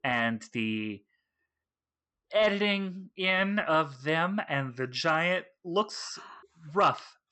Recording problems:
high frequencies cut off; noticeable; nothing above 8 kHz

